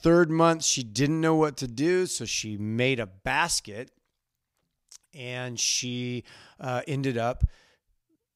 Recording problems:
none

